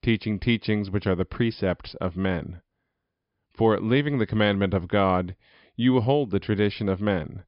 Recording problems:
high frequencies cut off; noticeable; nothing above 5.5 kHz

